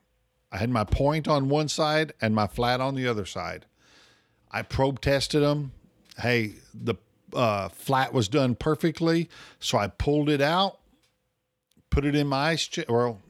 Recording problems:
none

